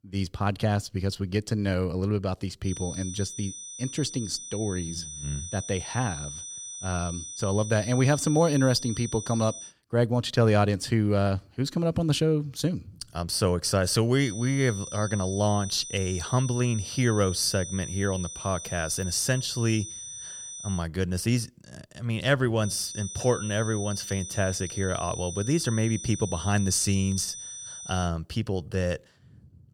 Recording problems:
high-pitched whine; loud; from 2.5 to 9.5 s, from 14 to 21 s and from 23 to 28 s; 6 kHz, 9 dB below the speech

